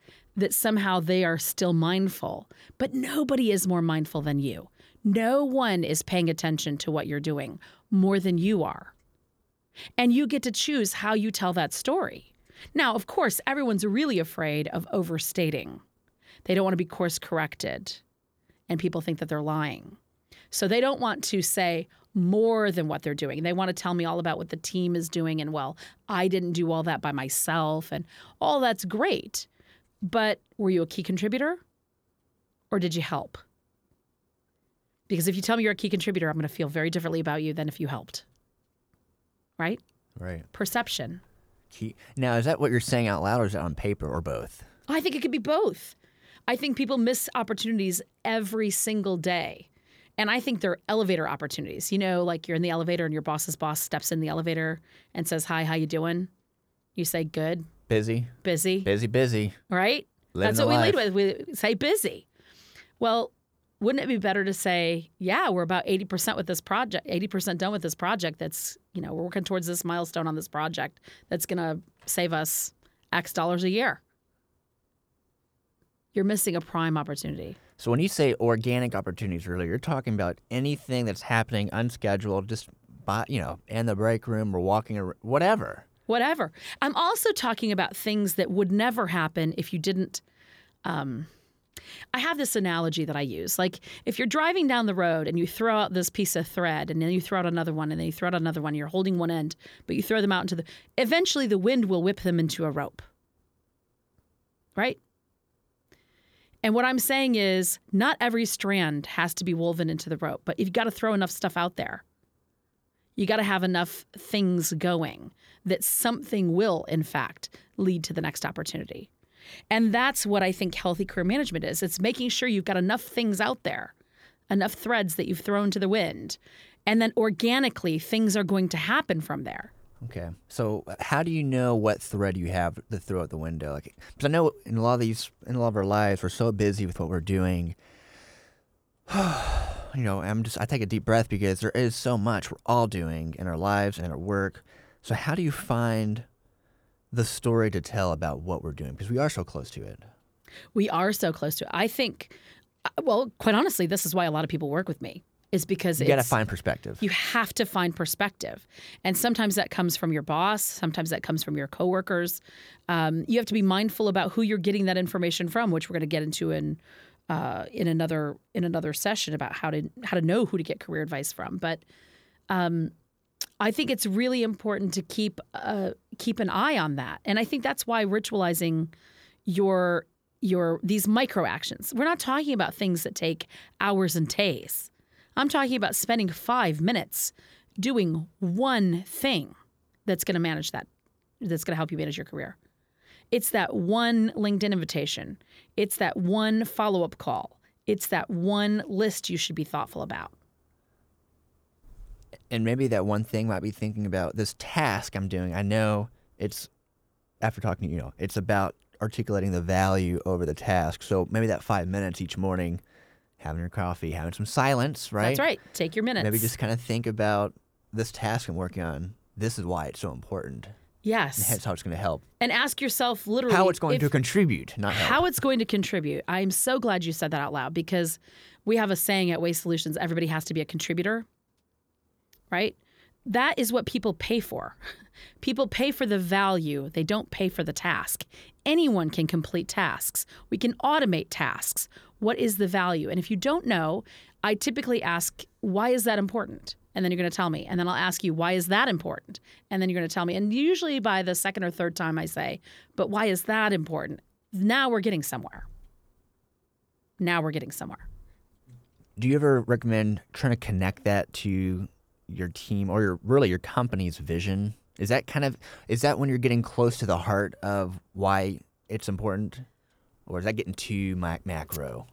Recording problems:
none

